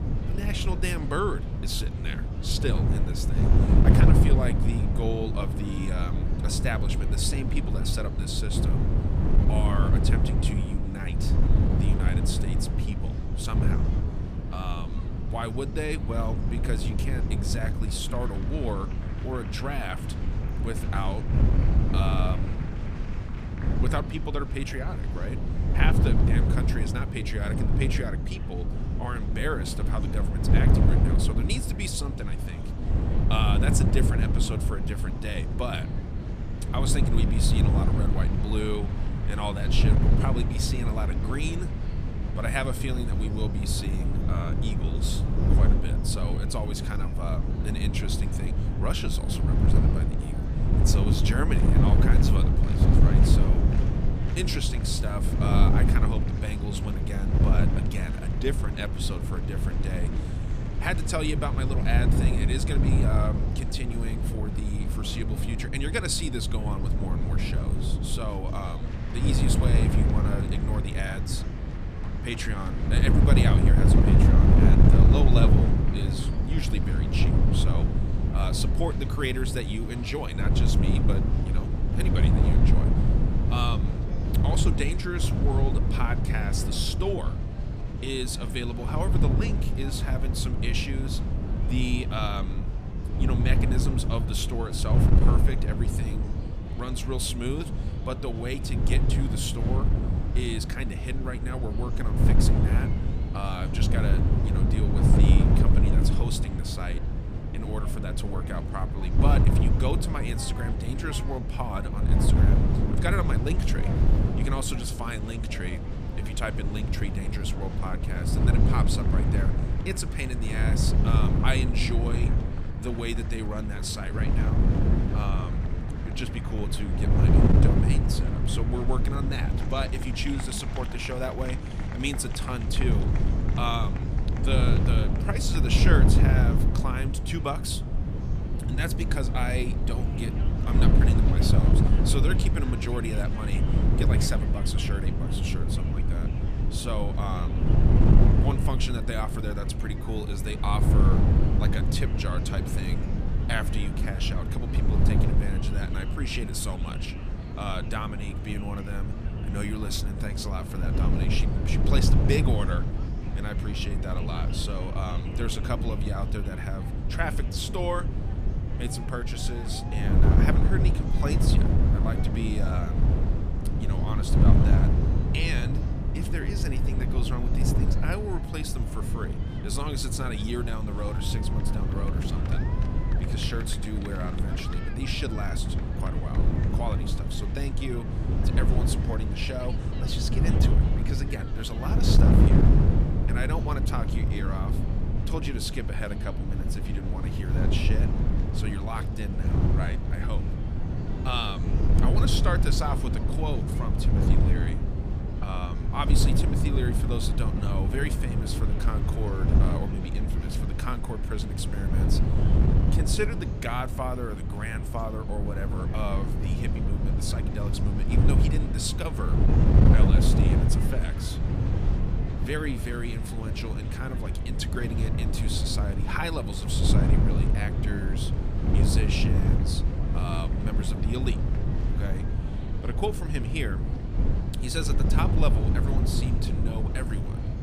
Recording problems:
wind noise on the microphone; heavy; 2 dB below the speech
murmuring crowd; noticeable; throughout; 10 dB below the speech

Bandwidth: 14.5 kHz